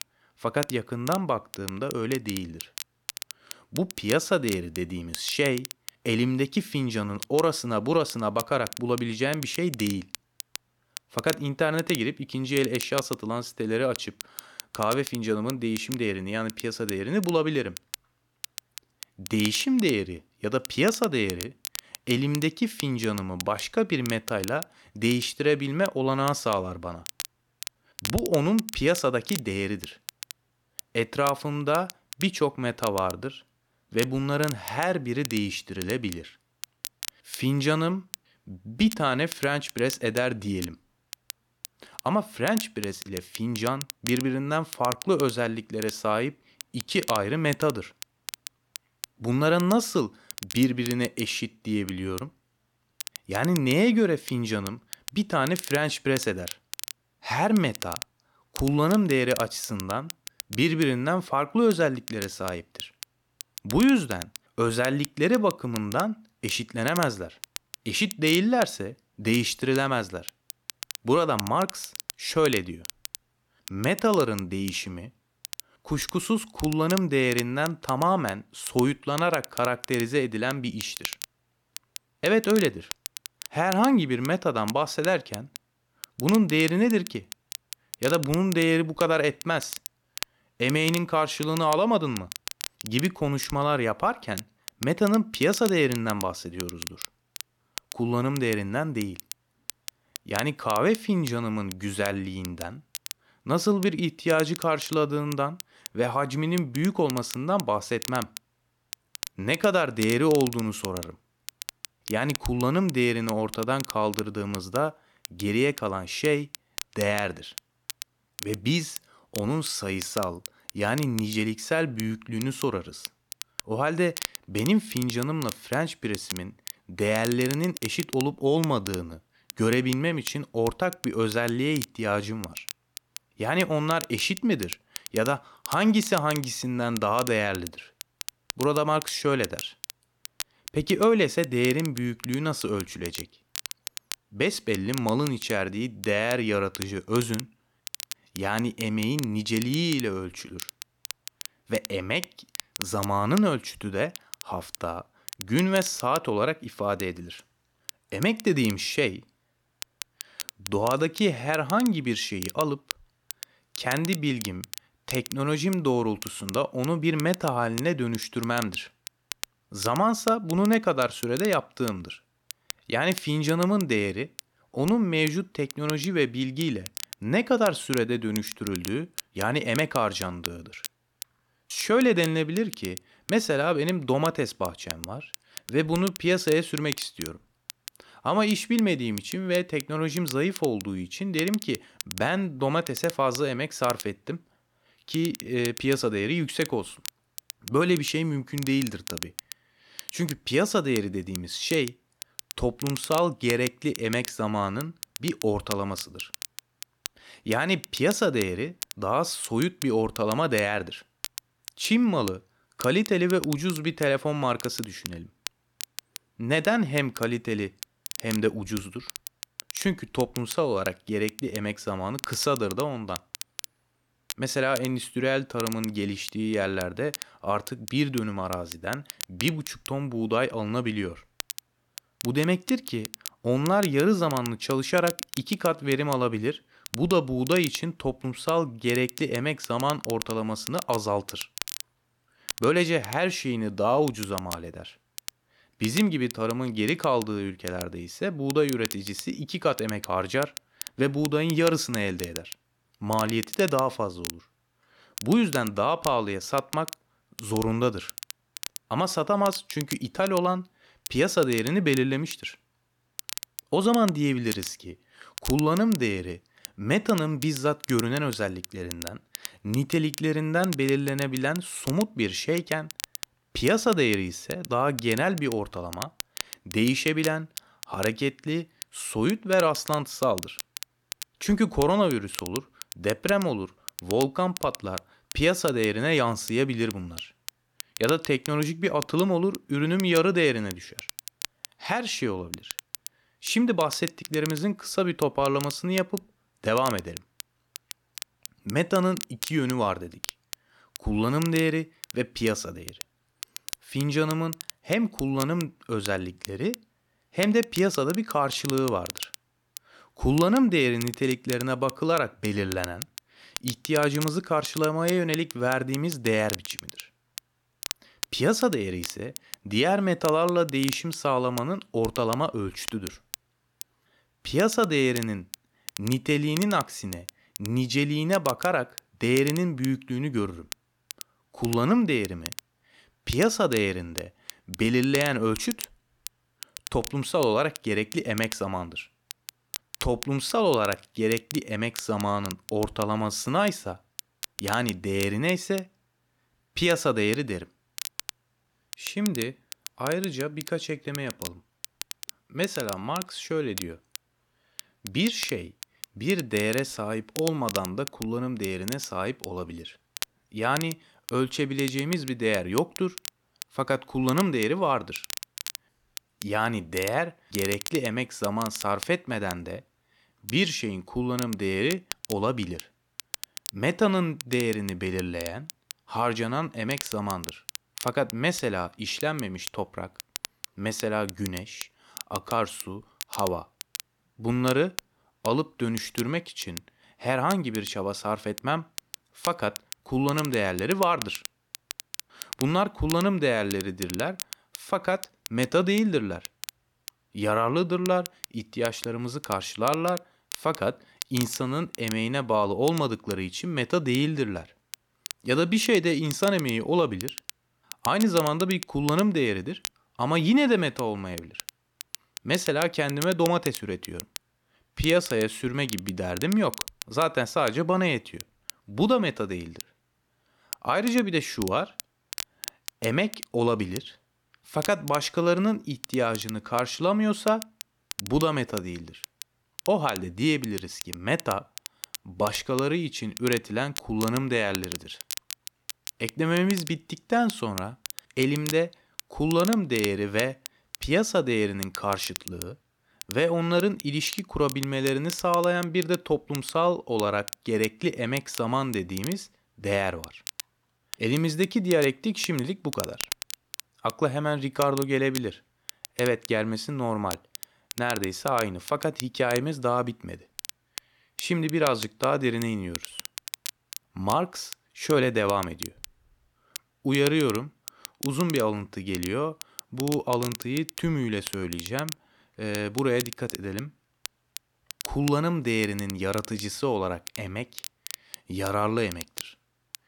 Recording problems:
crackle, like an old record; noticeable; 10 dB below the speech

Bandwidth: 18 kHz